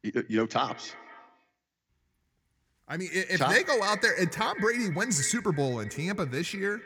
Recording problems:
echo of what is said; strong; throughout; 170 ms later, 10 dB below the speech

